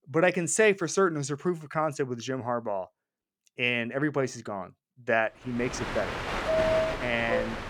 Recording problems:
train or aircraft noise; loud; from 5.5 s on; 1 dB below the speech

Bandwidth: 18 kHz